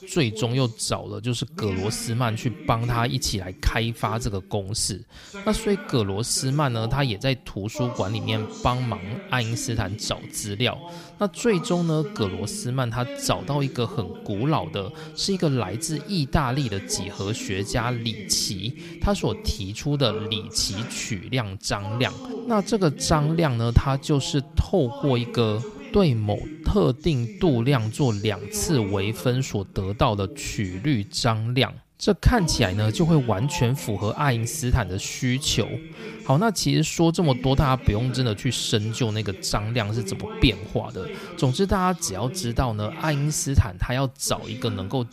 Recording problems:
voice in the background; noticeable; throughout; 15 dB below the speech

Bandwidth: 15 kHz